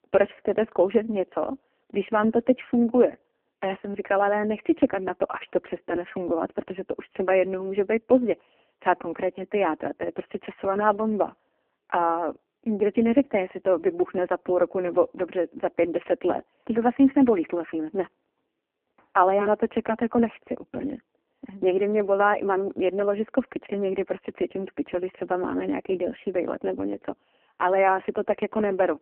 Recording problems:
phone-call audio; poor line

